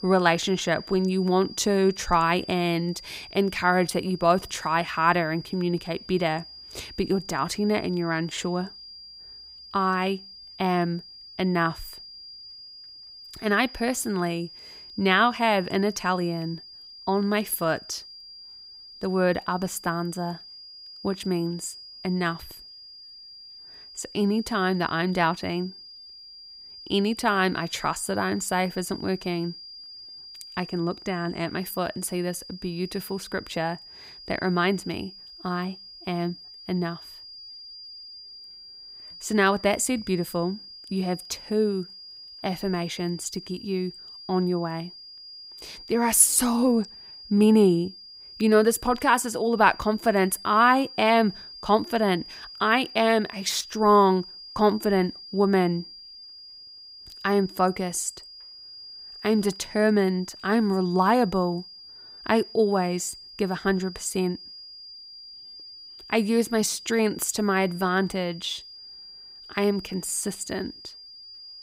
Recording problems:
high-pitched whine; noticeable; throughout; 5 kHz, 15 dB below the speech

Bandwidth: 15.5 kHz